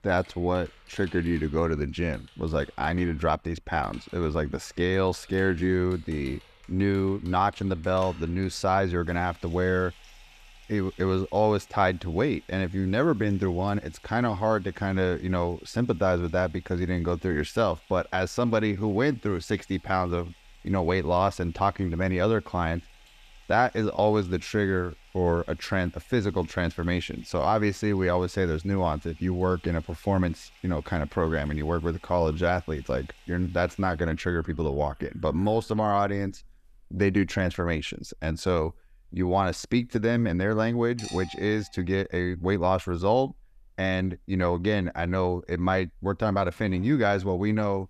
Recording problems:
household noises; faint; throughout; 25 dB below the speech

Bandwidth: 14.5 kHz